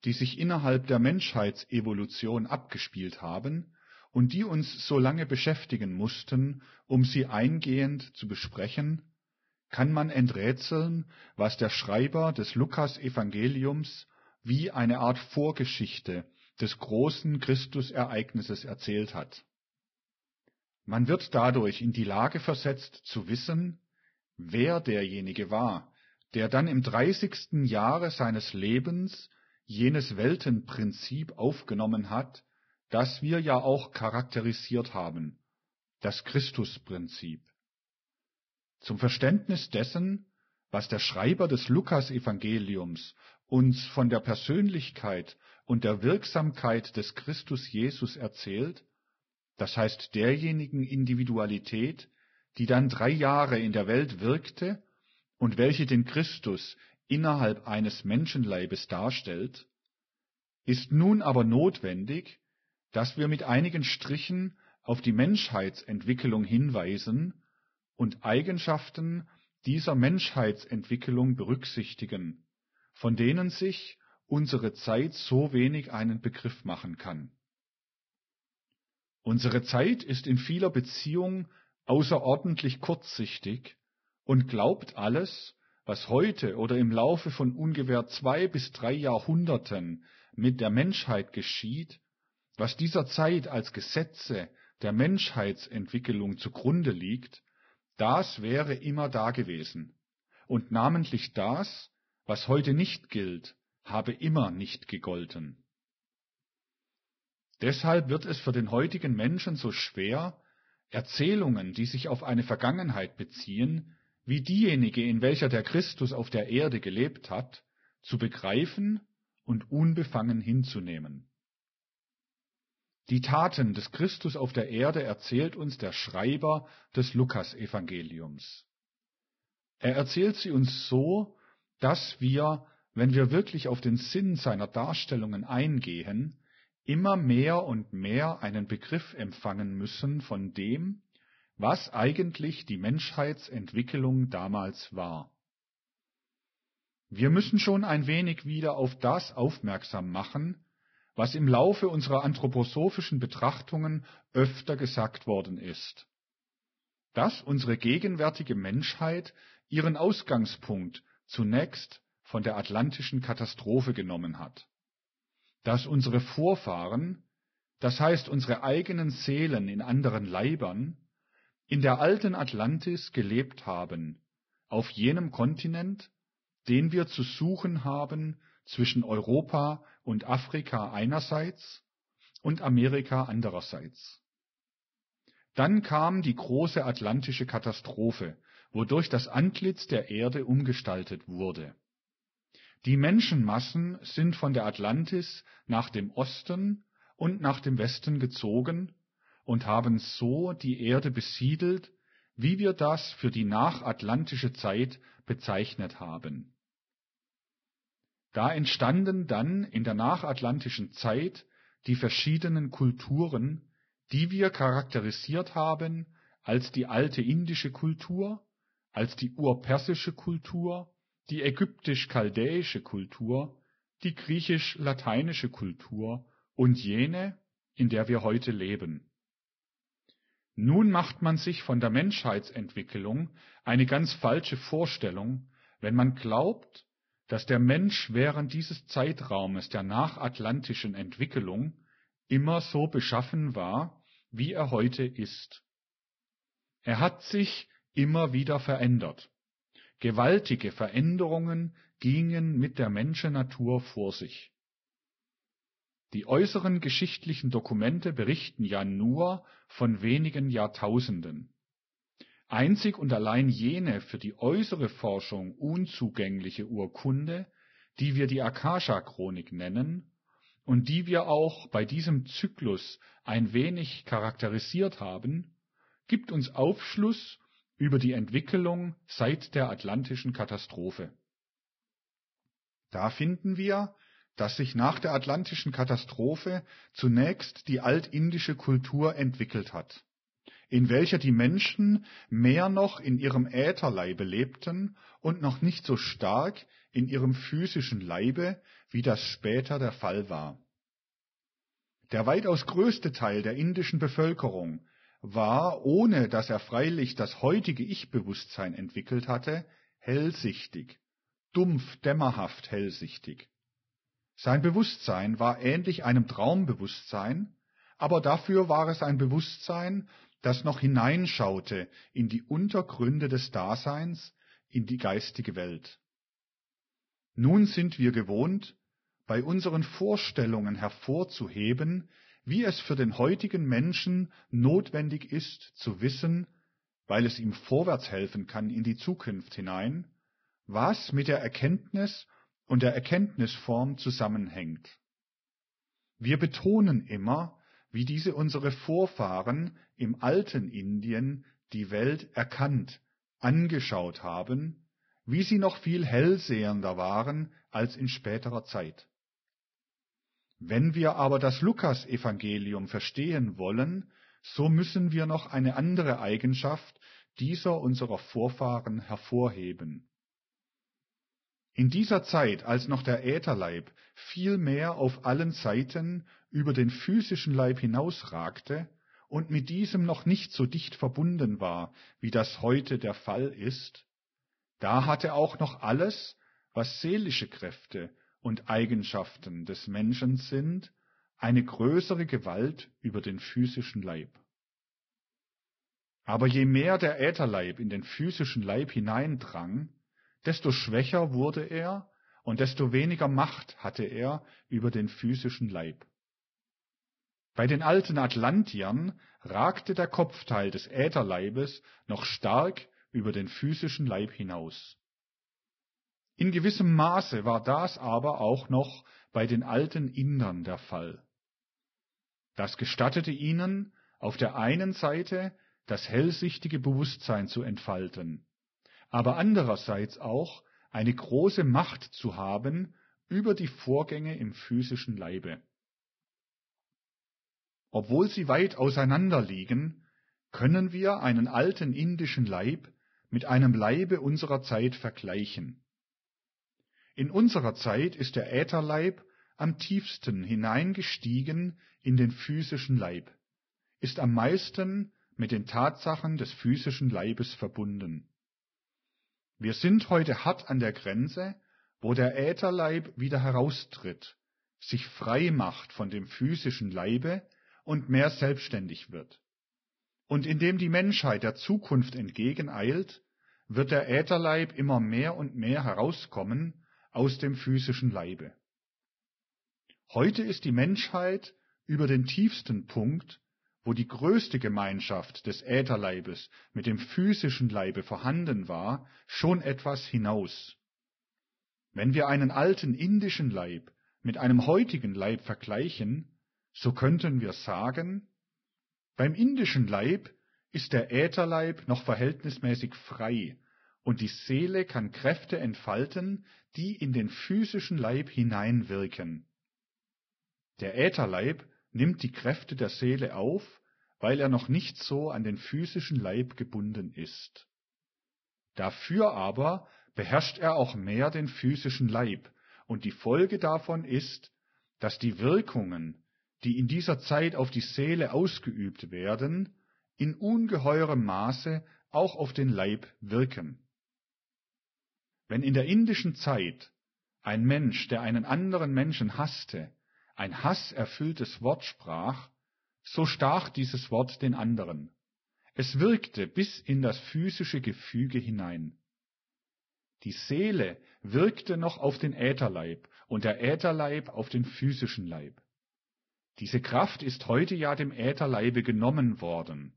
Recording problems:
garbled, watery; badly; nothing above 5.5 kHz

